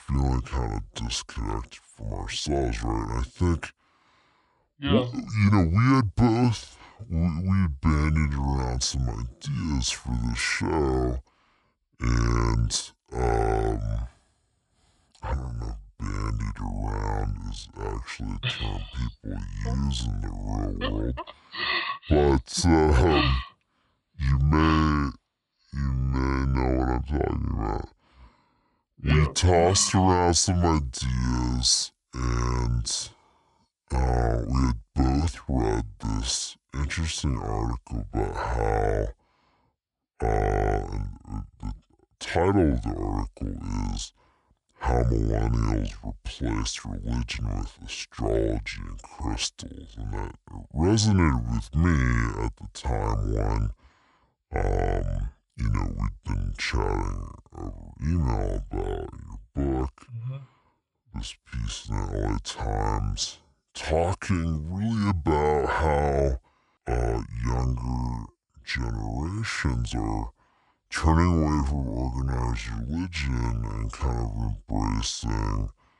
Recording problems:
wrong speed and pitch; too slow and too low; 0.6 times normal speed

